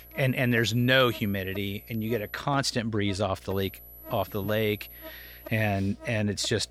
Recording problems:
high-pitched whine; noticeable; until 2.5 s and from 3.5 to 5.5 s; 12 kHz, 20 dB below the speech
electrical hum; faint; throughout; 60 Hz, 20 dB below the speech

